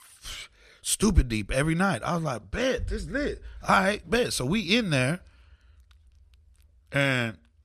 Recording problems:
none

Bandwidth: 14 kHz